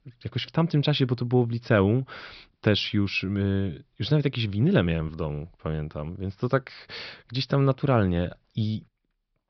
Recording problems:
high frequencies cut off; noticeable; nothing above 5.5 kHz

